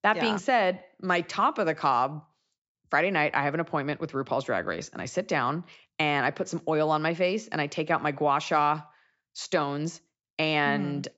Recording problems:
high frequencies cut off; noticeable; nothing above 8 kHz

